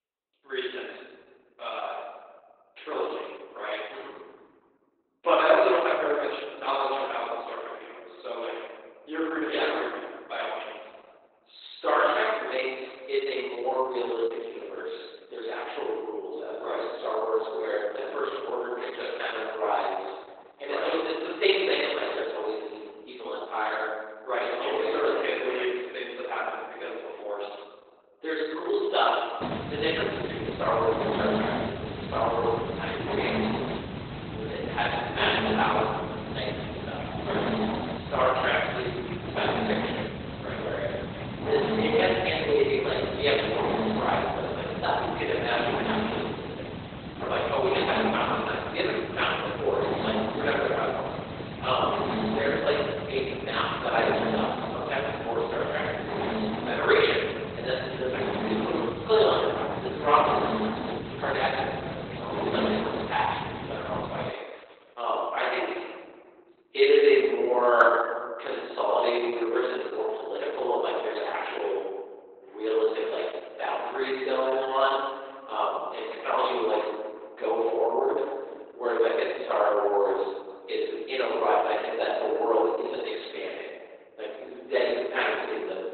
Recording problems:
room echo; strong; dies away in 1.5 s
off-mic speech; far
garbled, watery; badly; nothing above 4 kHz
thin; very; fading below 350 Hz
hiss; loud; from 29 s to 1:04; 5 dB below the speech

